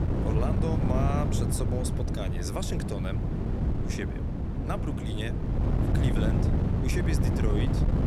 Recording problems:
wind noise on the microphone; heavy; as loud as the speech

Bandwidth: 18.5 kHz